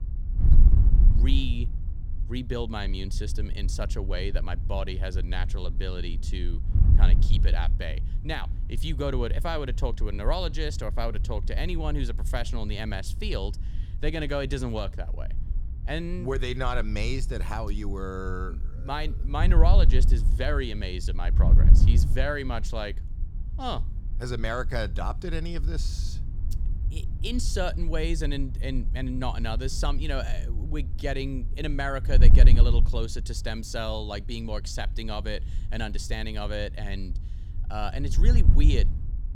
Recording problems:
wind noise on the microphone; occasional gusts; 10 dB below the speech

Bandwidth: 18.5 kHz